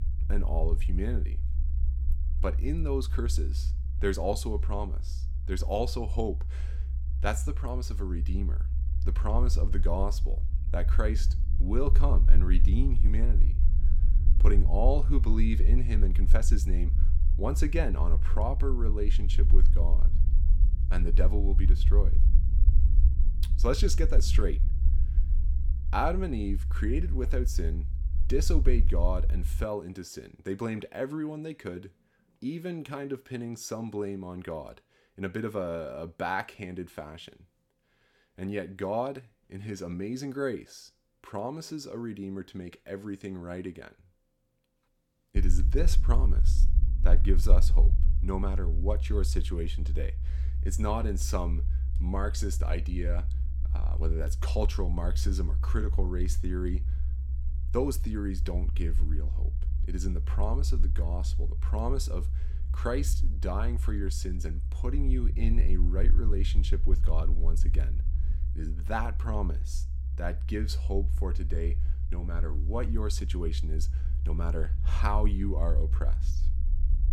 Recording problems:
low rumble; noticeable; until 30 s and from 45 s on; 15 dB below the speech

